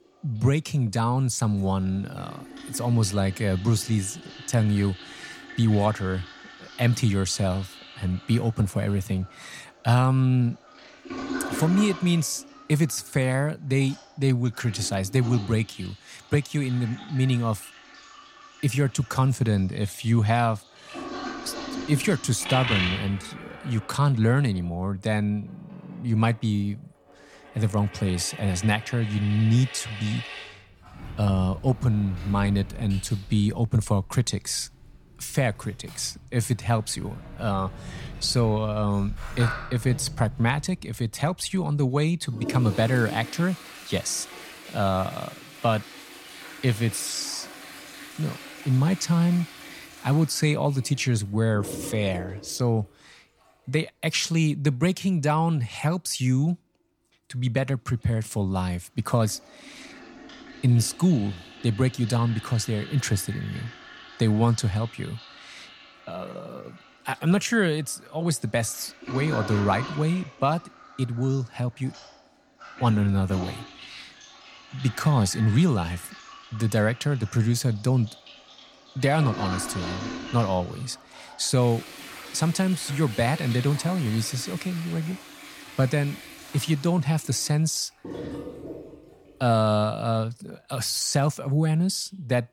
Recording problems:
household noises; noticeable; throughout; 15 dB below the speech

